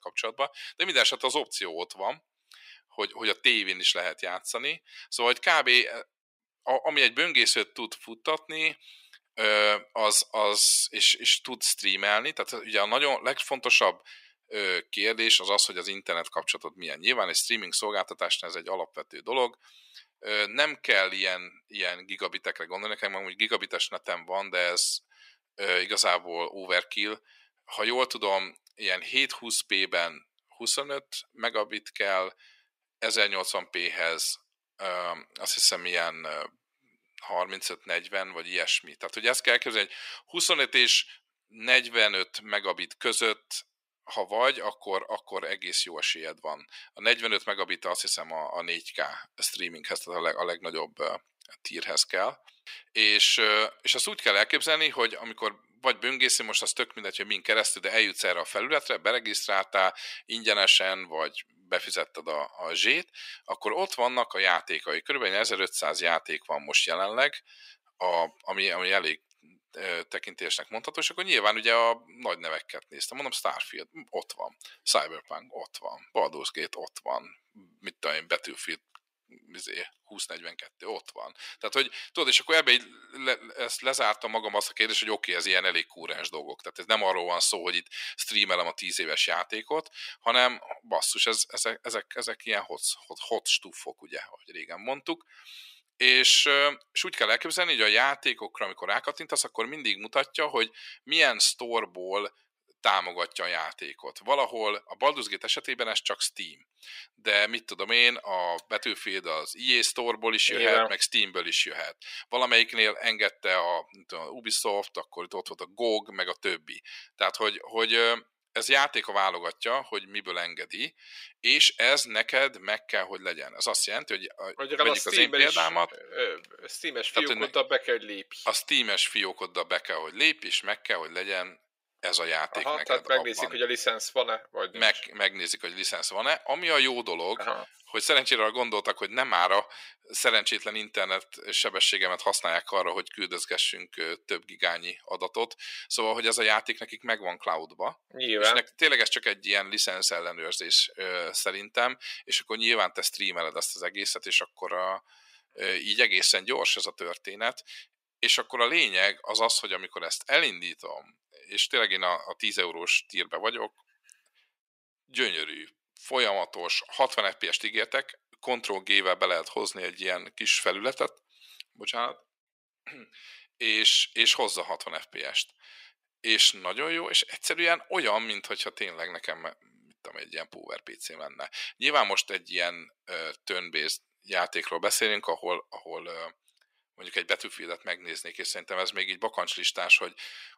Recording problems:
thin; very; fading below 500 Hz

